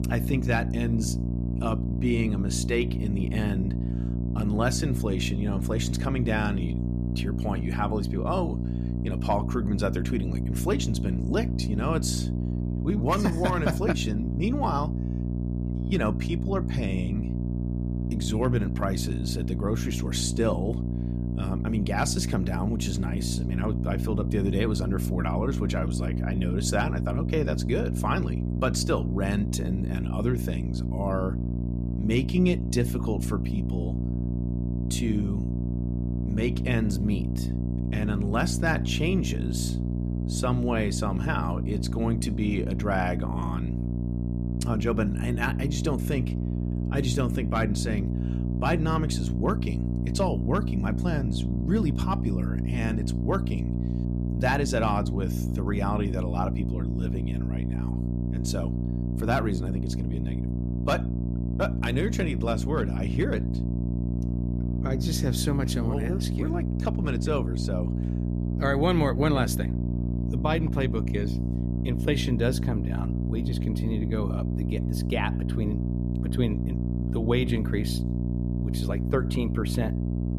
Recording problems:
electrical hum; loud; throughout; 60 Hz, 7 dB below the speech

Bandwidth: 14.5 kHz